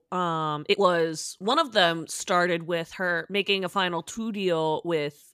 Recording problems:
uneven, jittery; strongly; from 0.5 to 5 s

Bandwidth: 14.5 kHz